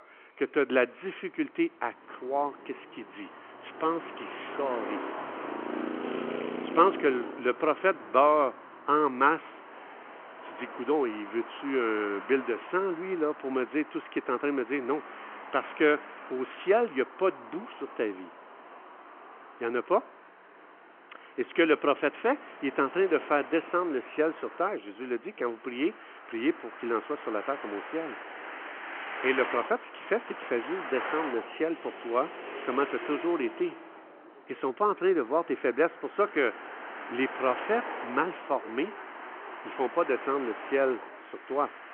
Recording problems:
phone-call audio
traffic noise; noticeable; throughout; 10 dB below the speech

